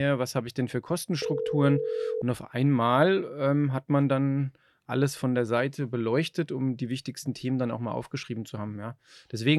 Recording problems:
abrupt cut into speech; at the start and the end
phone ringing; noticeable; from 1 to 2 s; peak 2 dB below the speech

